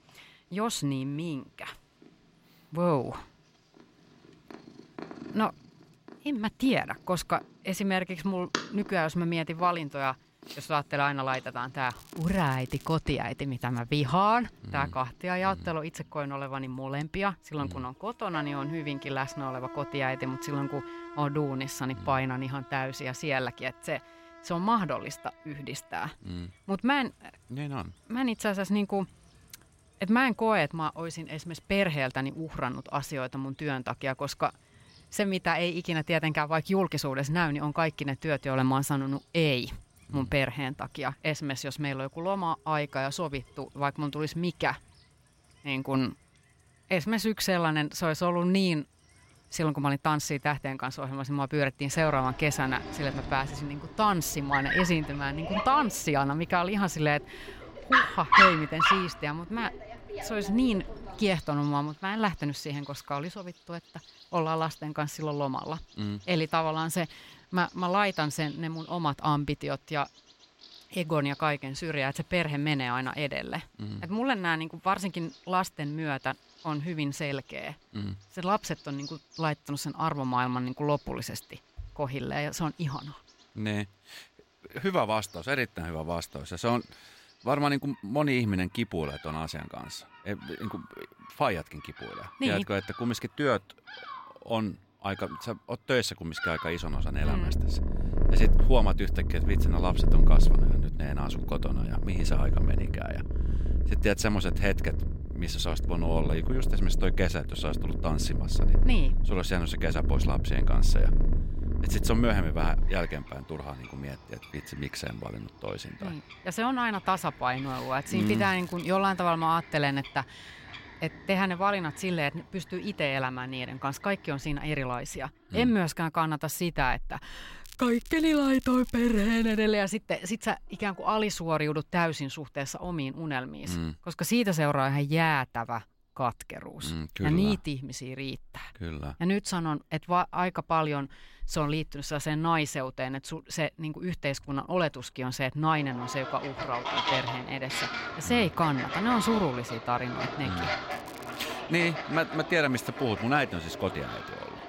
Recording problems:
animal sounds; loud; throughout; 2 dB below the speech
crackling; faint; 4 times, first at 12 s; 20 dB below the speech

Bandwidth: 16 kHz